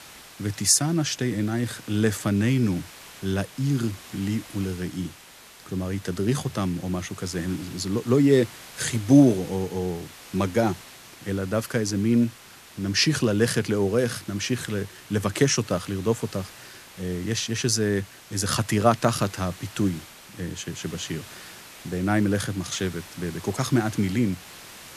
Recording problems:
hiss; noticeable; throughout; 20 dB below the speech

